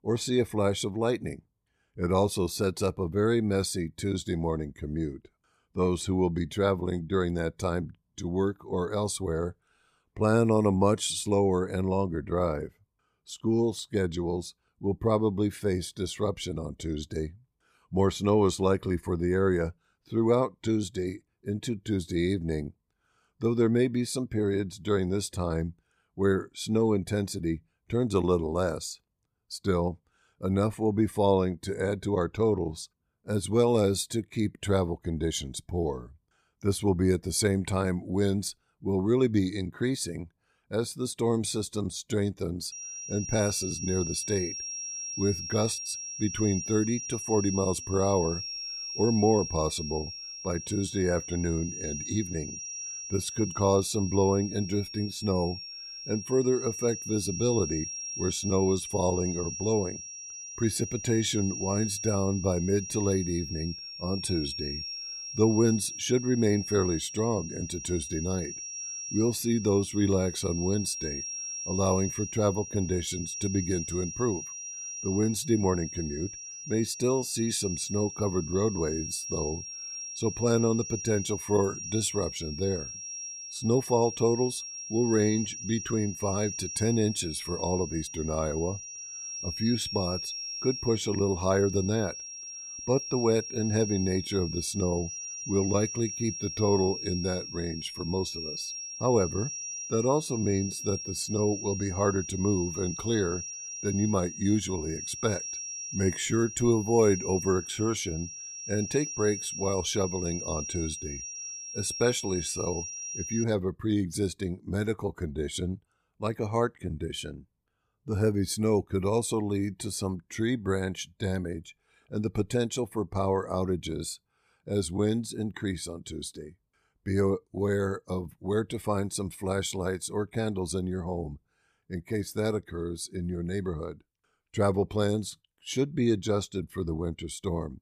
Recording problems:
high-pitched whine; loud; from 43 s to 1:53; 5.5 kHz, 7 dB below the speech

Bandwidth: 15 kHz